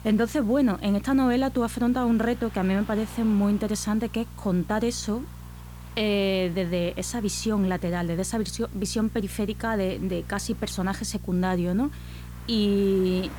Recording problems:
electrical hum; faint; throughout; 60 Hz, 25 dB below the speech
traffic noise; faint; throughout; 25 dB below the speech
hiss; faint; throughout; 25 dB below the speech

